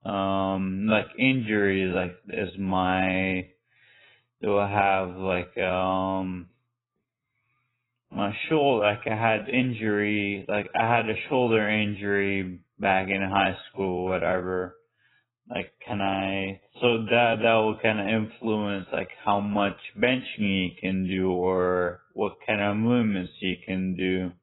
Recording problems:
garbled, watery; badly; nothing above 3.5 kHz
wrong speed, natural pitch; too slow; 0.6 times normal speed

